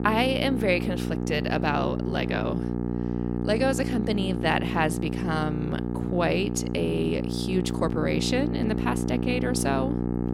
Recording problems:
electrical hum; loud; throughout; 60 Hz, 6 dB below the speech

